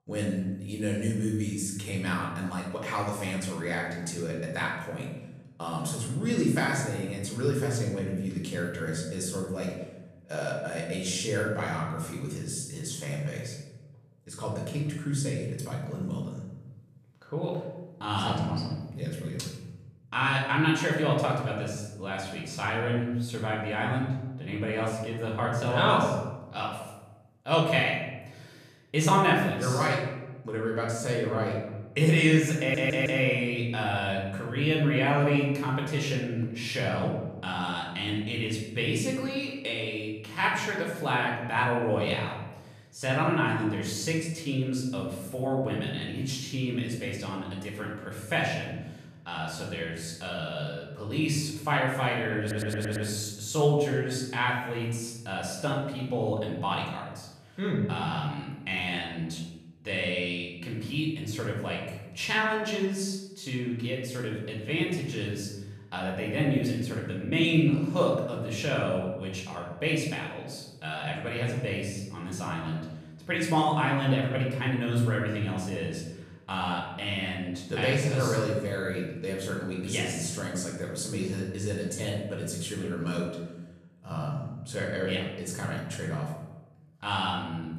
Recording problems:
off-mic speech; far
room echo; noticeable; dies away in 1 s
audio stuttering; at 33 s and at 52 s

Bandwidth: 14 kHz